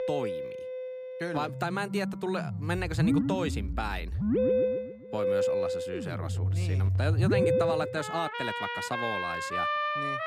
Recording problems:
background music; very loud; throughout; 5 dB above the speech

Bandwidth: 14.5 kHz